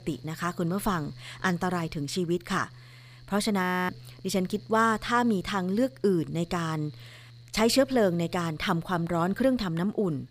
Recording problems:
machinery noise; faint; throughout; 20 dB below the speech
audio freezing; at 3.5 s

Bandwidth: 15 kHz